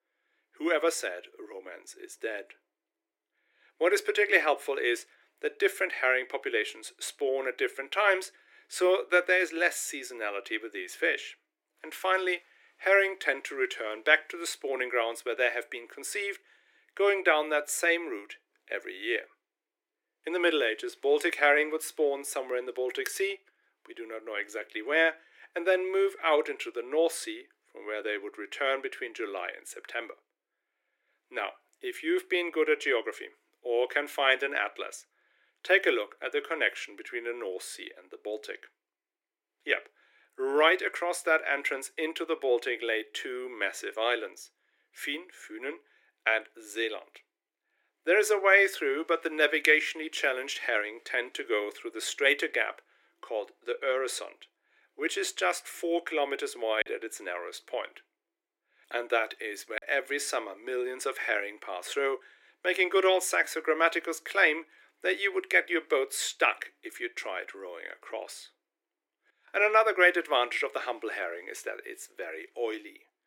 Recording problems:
thin; very; fading below 300 Hz
choppy; occasionally; from 57 s to 1:00; 2% of the speech affected

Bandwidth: 16.5 kHz